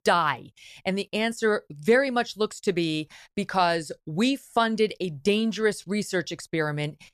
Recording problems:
none

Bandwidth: 14 kHz